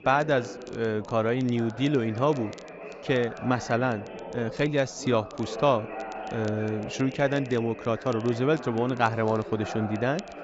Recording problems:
high frequencies cut off; noticeable; nothing above 8 kHz
background chatter; noticeable; throughout; 4 voices, 10 dB below the speech
crackle, like an old record; faint; 25 dB below the speech

